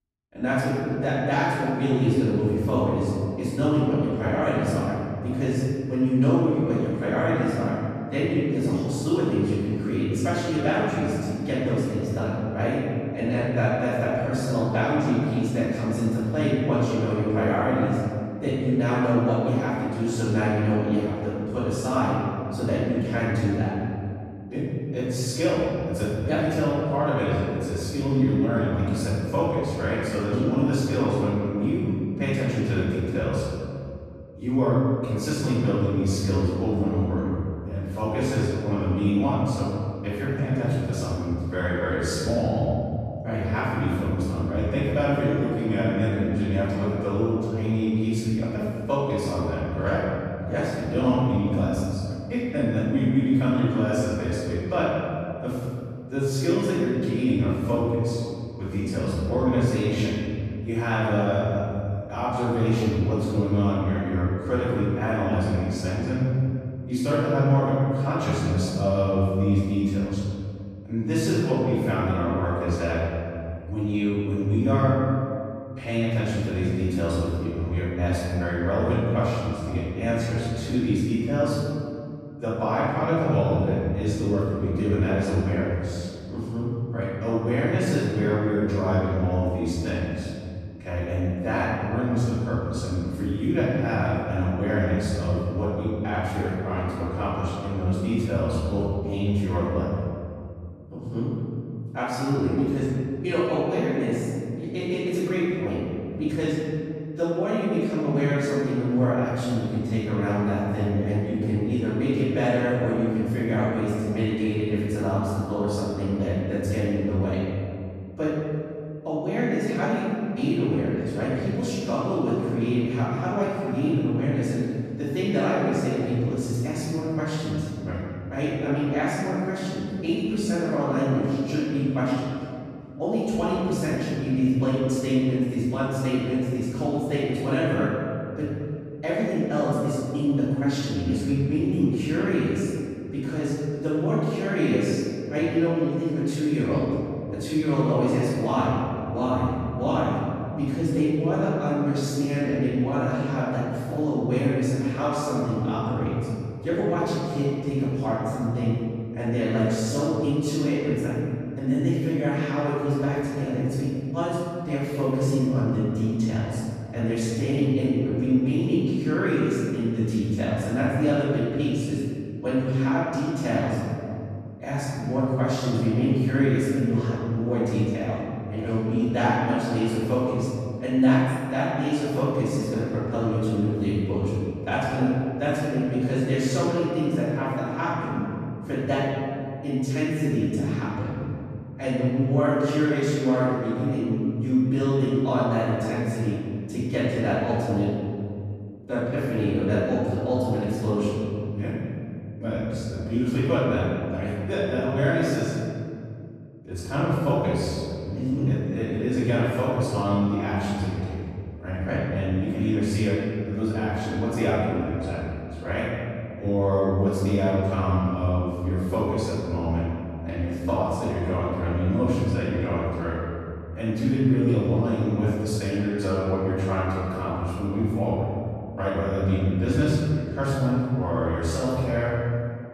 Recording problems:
room echo; strong; dies away in 2.4 s
off-mic speech; far

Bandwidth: 14.5 kHz